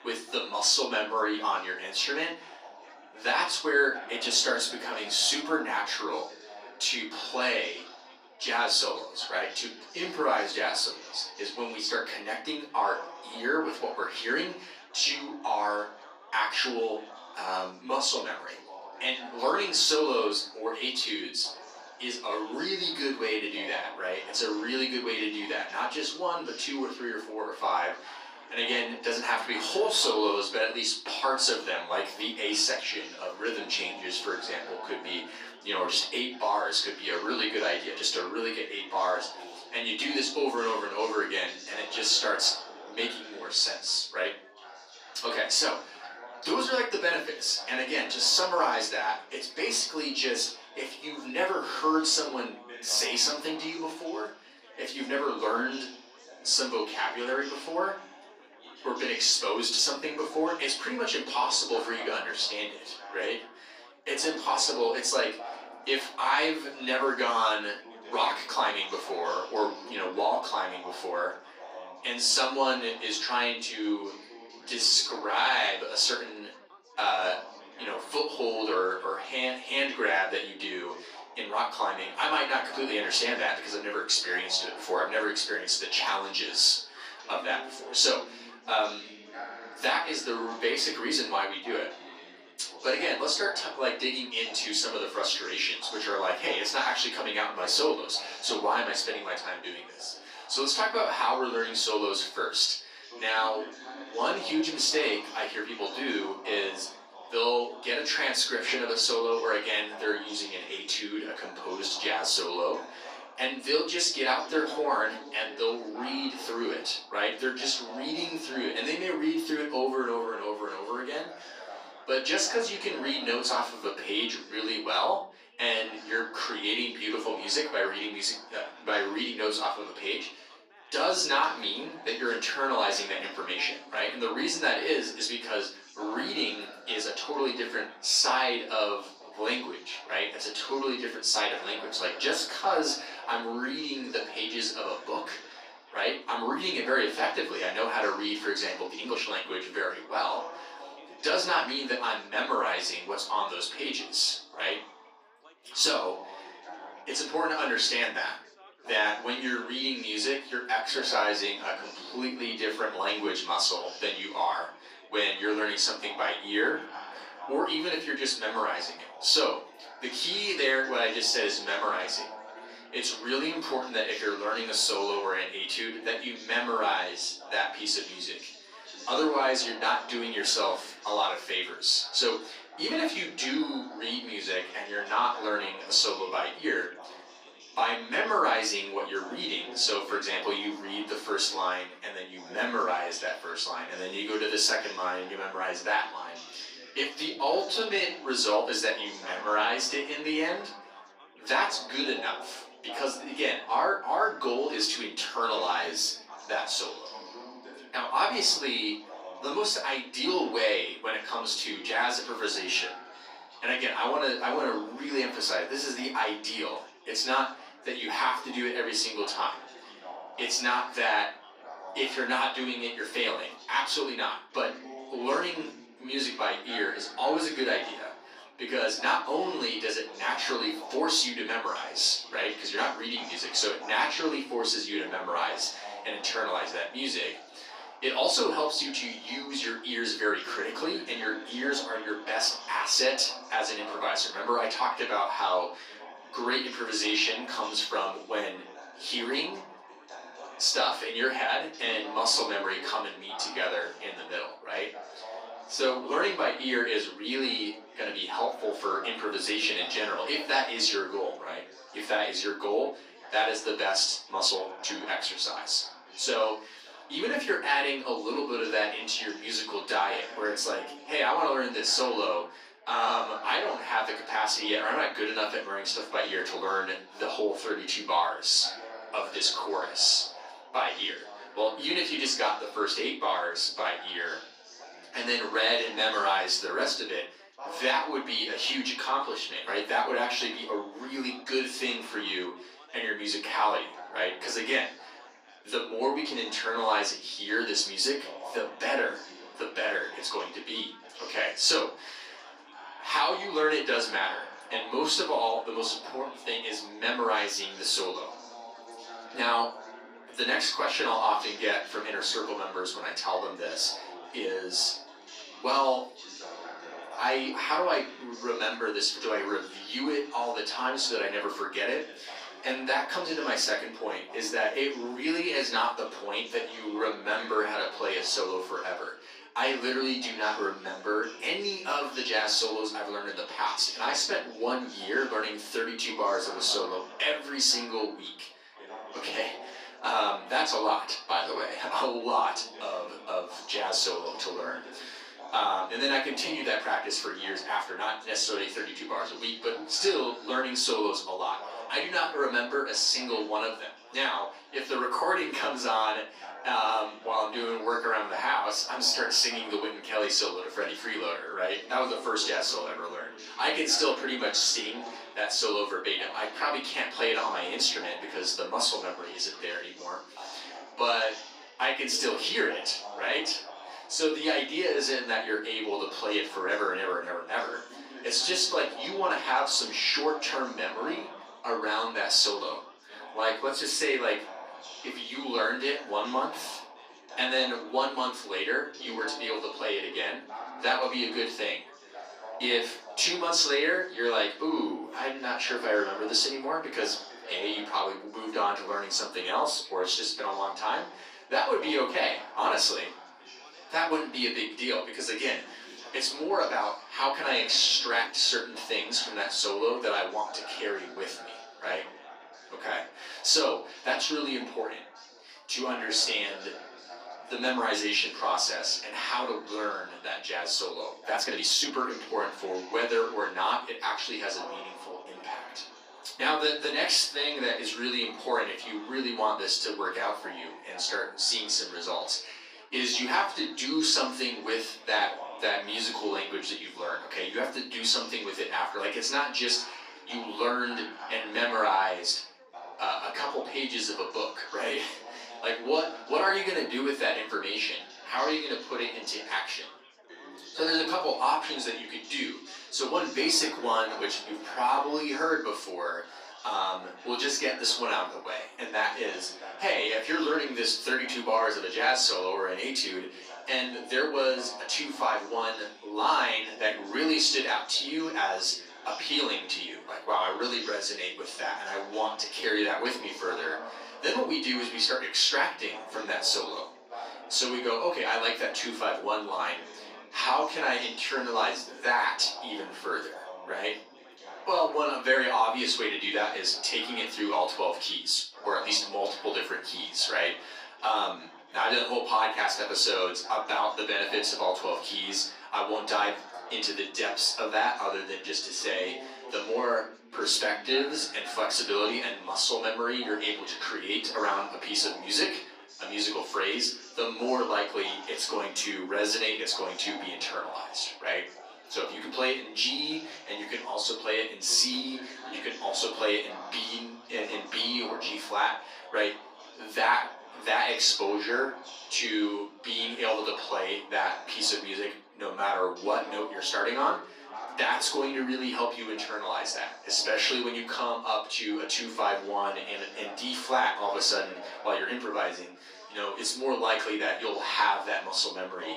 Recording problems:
off-mic speech; far
thin; somewhat; fading below 300 Hz
room echo; slight; dies away in 0.4 s
chatter from many people; noticeable; throughout; 15 dB below the speech
uneven, jittery; strongly; from 4 s to 7:53

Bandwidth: 14.5 kHz